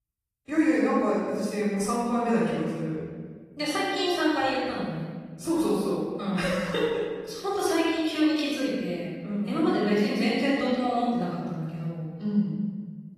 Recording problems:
room echo; strong; dies away in 1.6 s
off-mic speech; far
garbled, watery; slightly; nothing above 14.5 kHz

